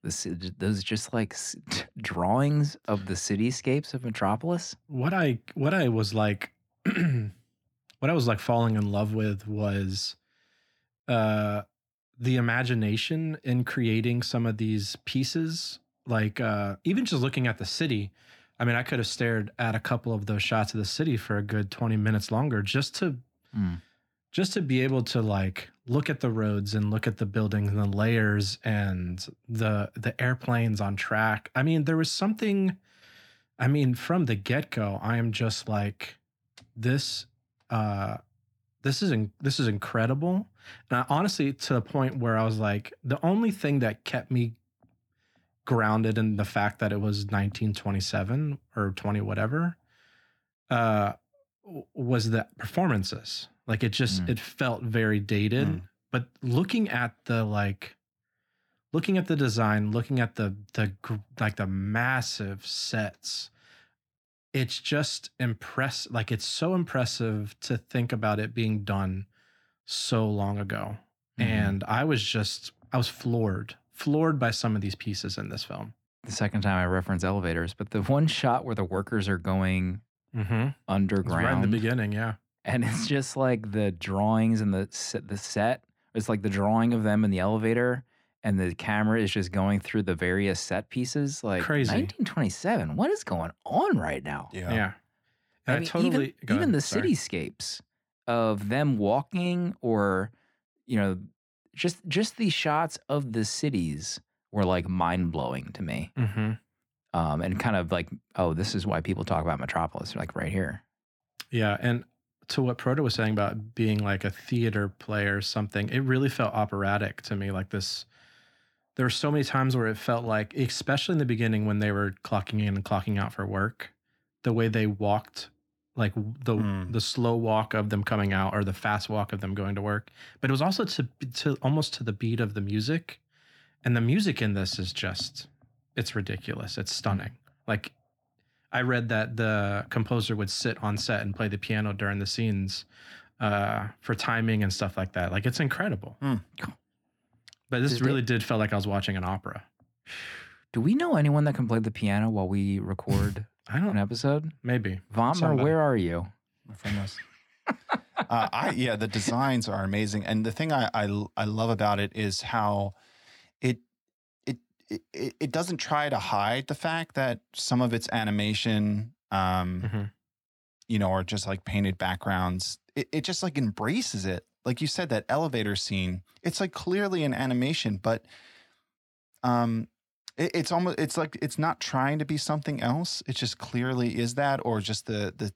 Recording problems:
muffled; slightly; fading above 2.5 kHz

